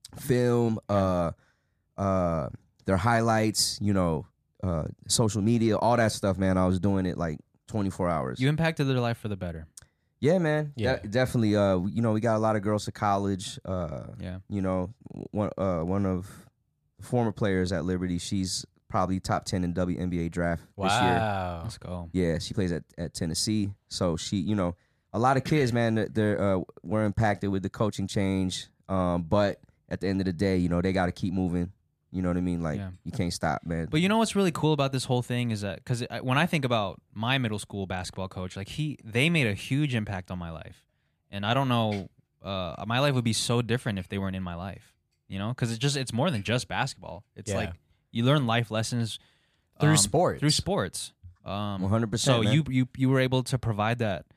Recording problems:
none

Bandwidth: 14.5 kHz